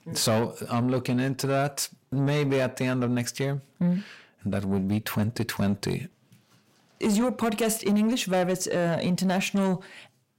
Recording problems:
distortion; slight; 10 dB below the speech

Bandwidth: 16 kHz